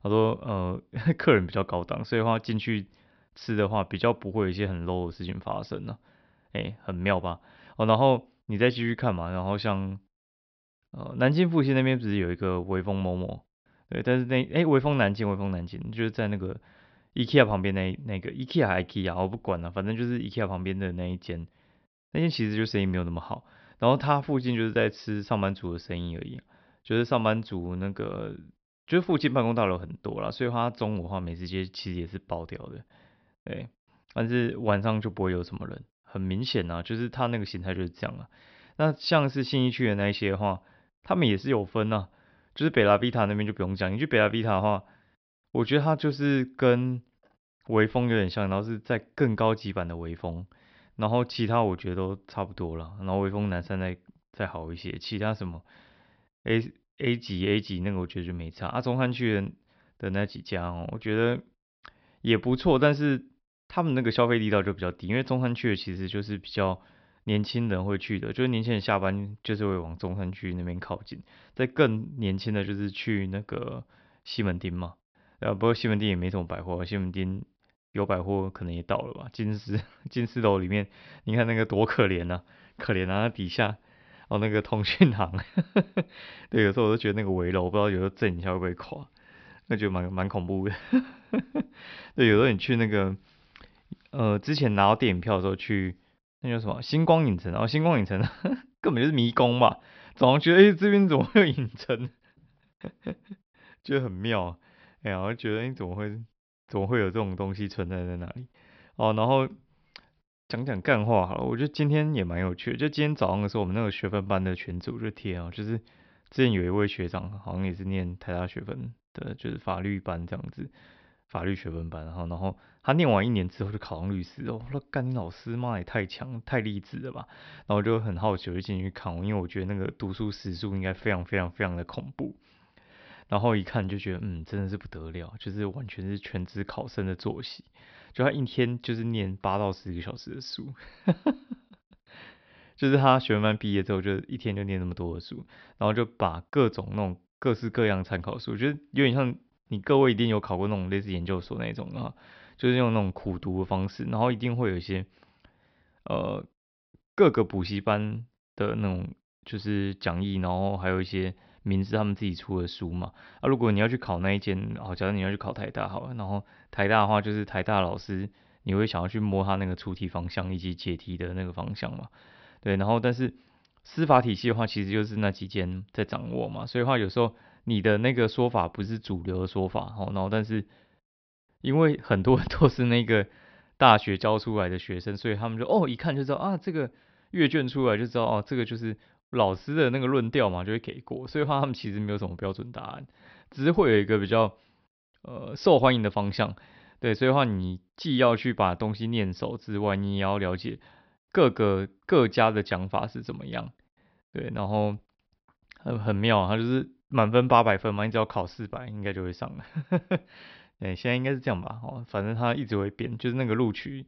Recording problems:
high frequencies cut off; noticeable; nothing above 5.5 kHz

